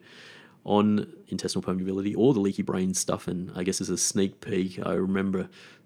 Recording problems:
uneven, jittery; strongly; from 1 to 5 s

